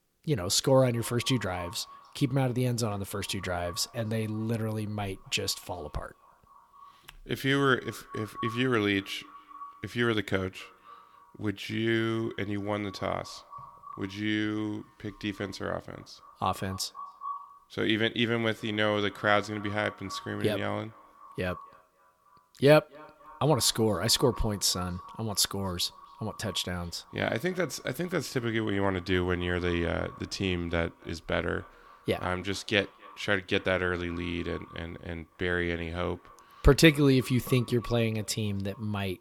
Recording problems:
echo of what is said; faint; throughout; 260 ms later, 20 dB below the speech

